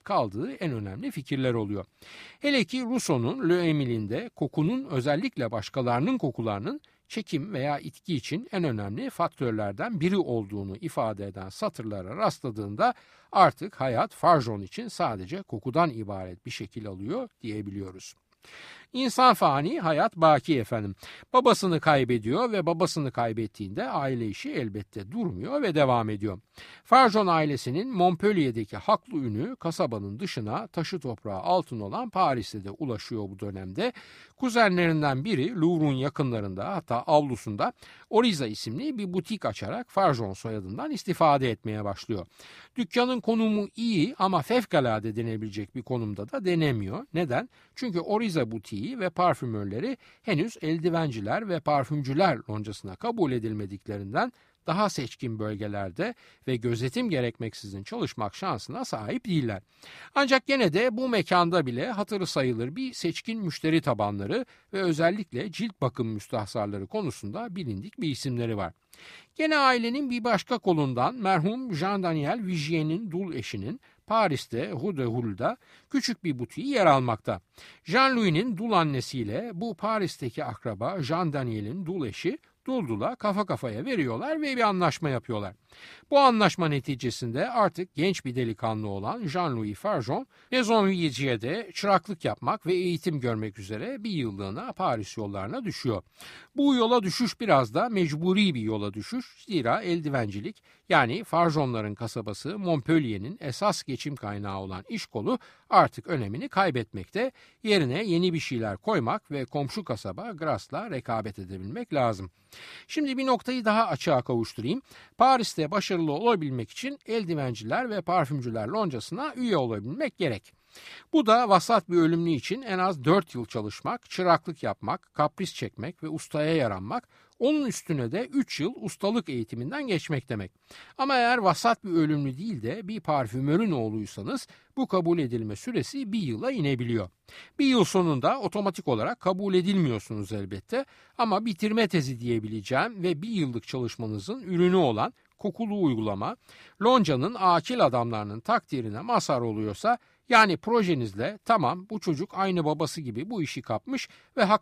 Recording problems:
none

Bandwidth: 15 kHz